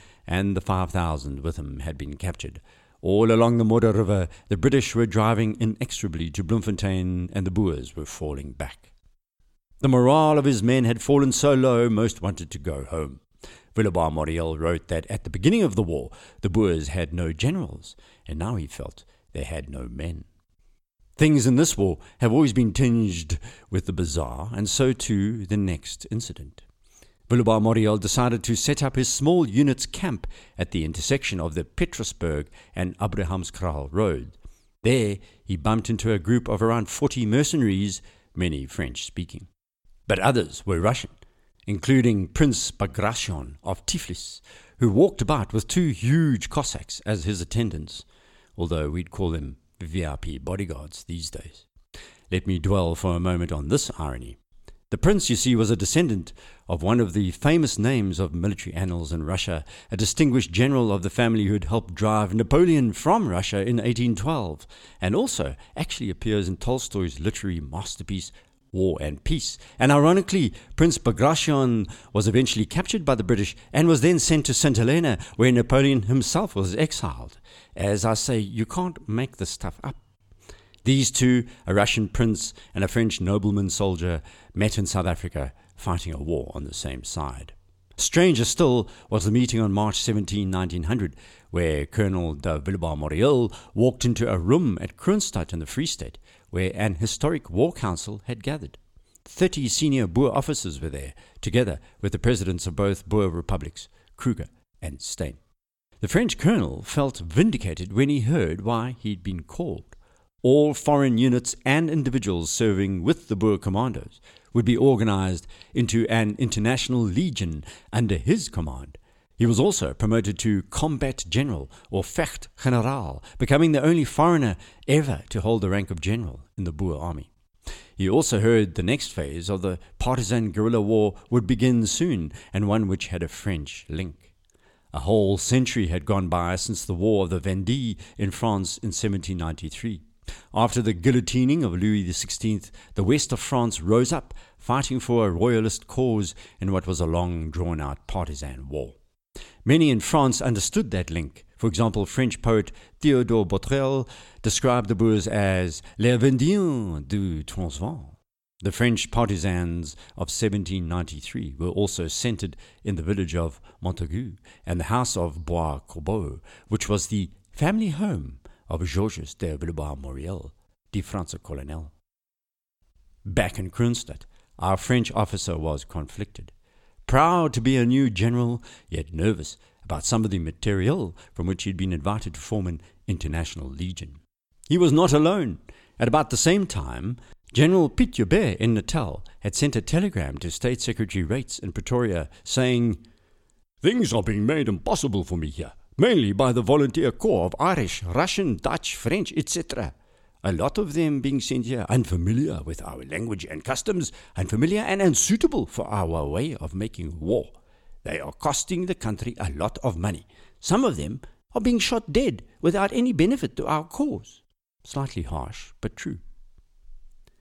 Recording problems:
none

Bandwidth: 17 kHz